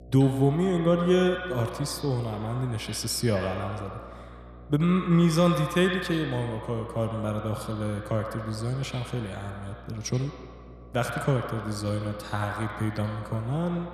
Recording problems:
echo of what is said; strong; throughout; 80 ms later, 9 dB below the speech
electrical hum; faint; throughout; 60 Hz, 25 dB below the speech

